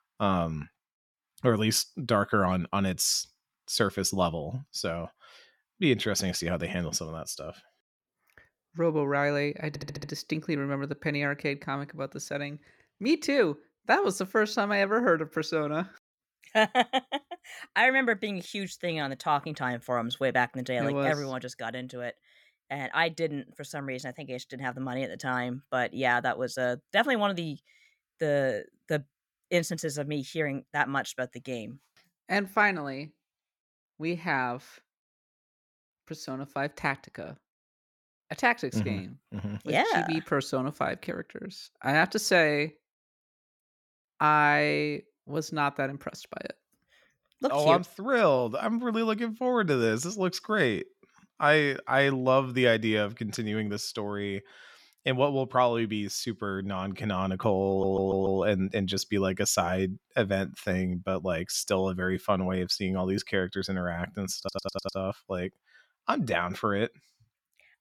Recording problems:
audio stuttering; at 9.5 s, at 58 s and at 1:04

